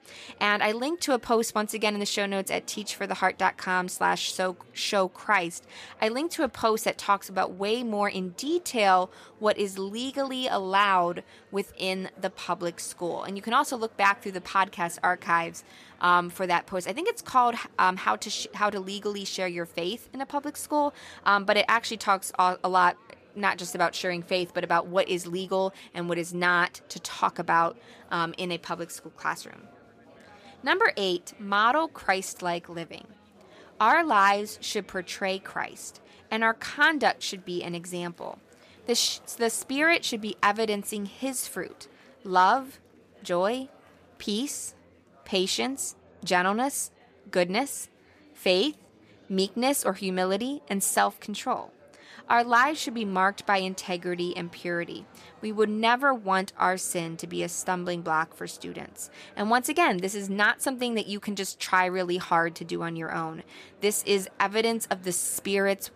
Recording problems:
chatter from many people; faint; throughout; 30 dB below the speech

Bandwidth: 14.5 kHz